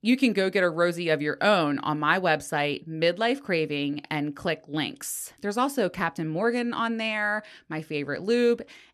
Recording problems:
none

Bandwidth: 13.5 kHz